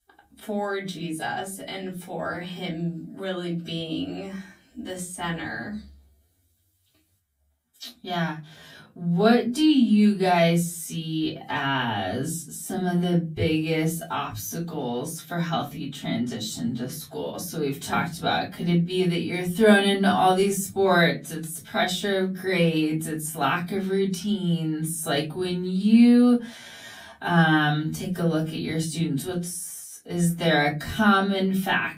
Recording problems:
off-mic speech; far
wrong speed, natural pitch; too slow; 0.6 times normal speed
room echo; very slight; dies away in 0.3 s

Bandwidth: 15.5 kHz